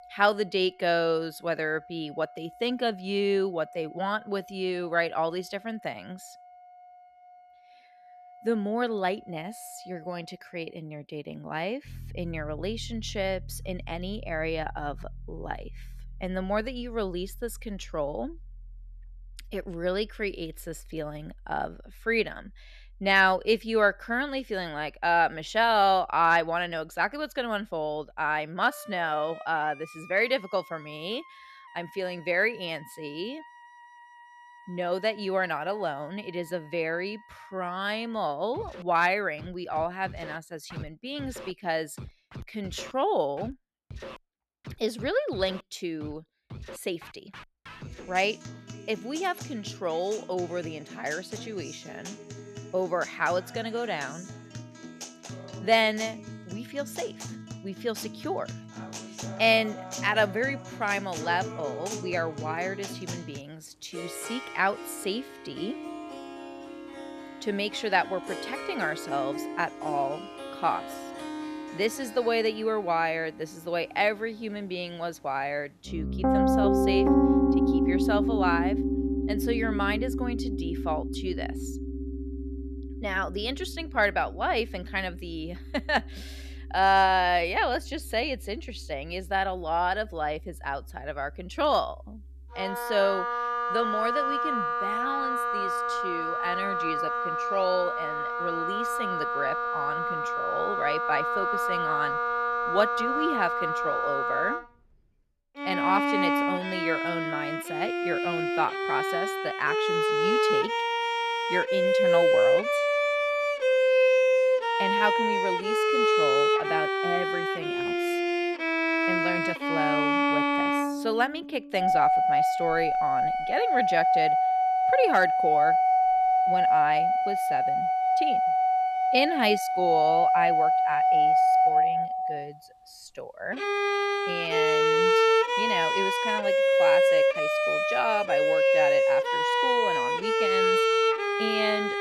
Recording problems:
background music; very loud; throughout; 4 dB above the speech

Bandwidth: 14 kHz